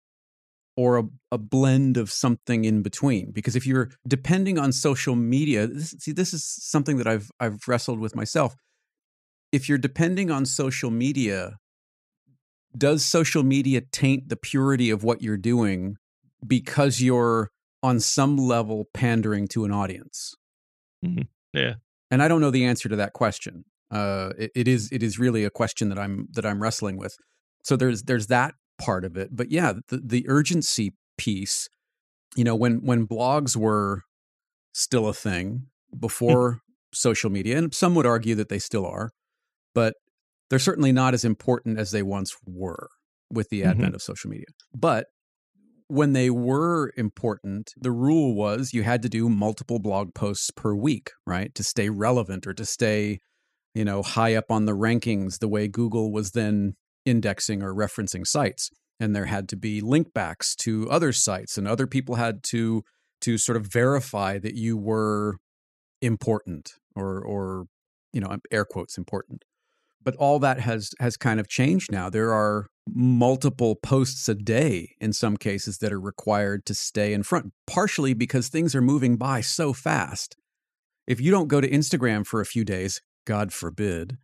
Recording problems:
none

